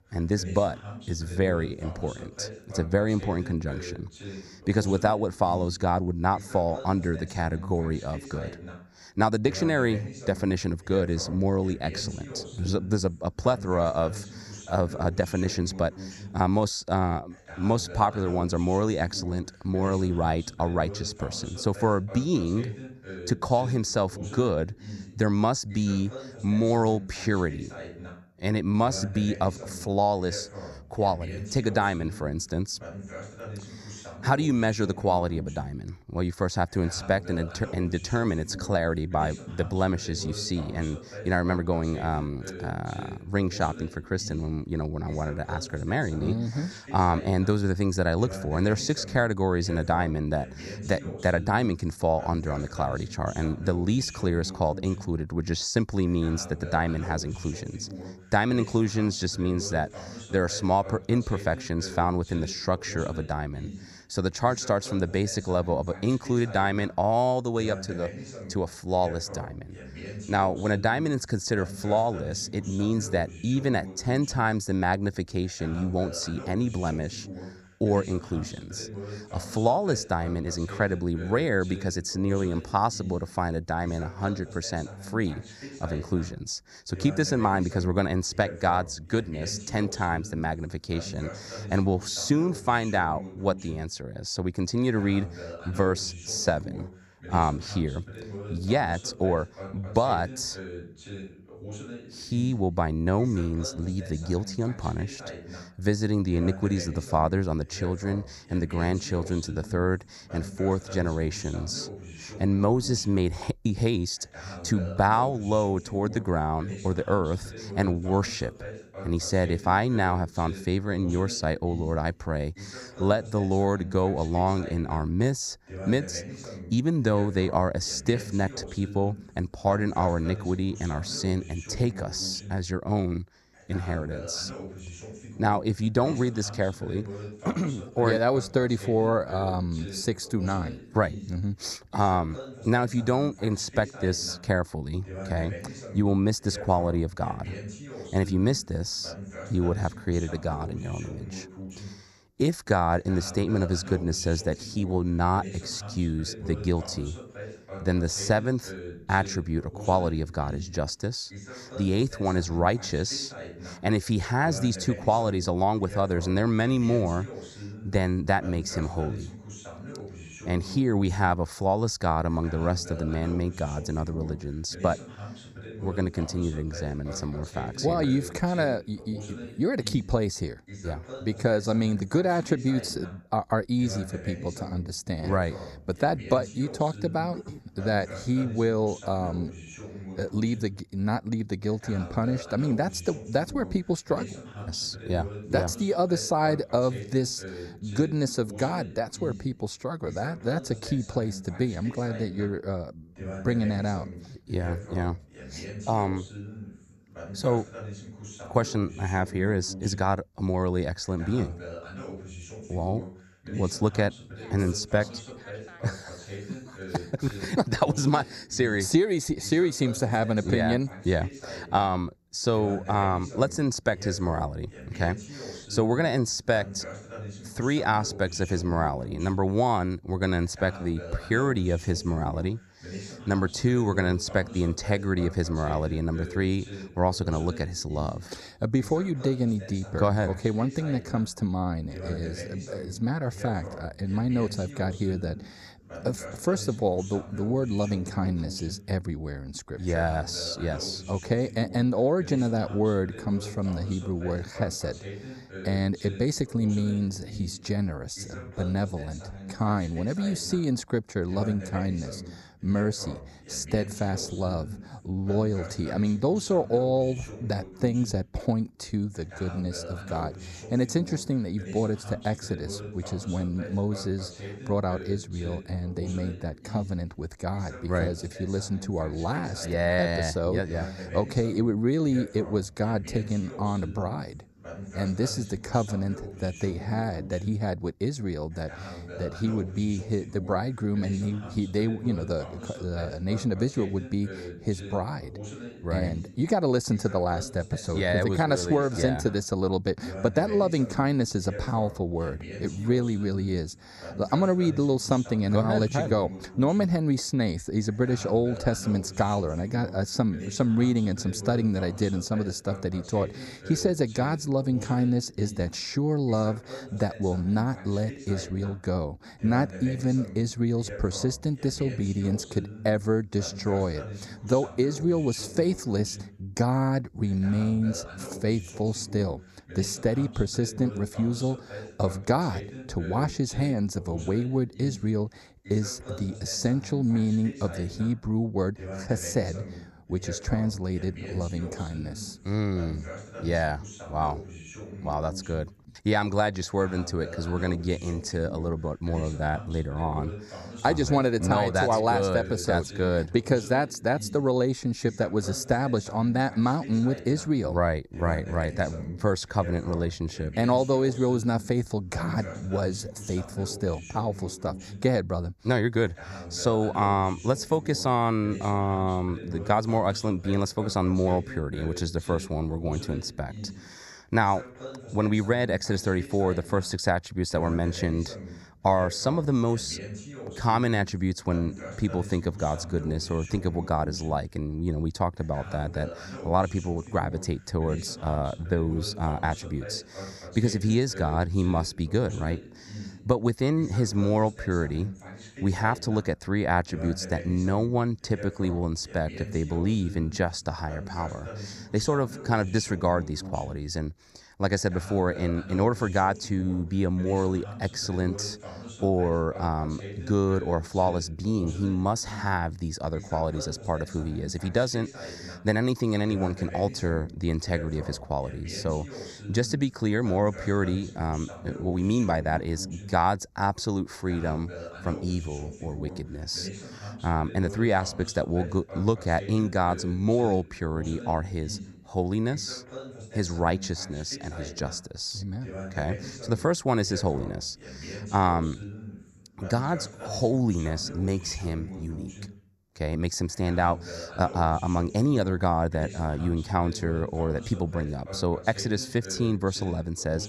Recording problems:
voice in the background; noticeable; throughout; 15 dB below the speech

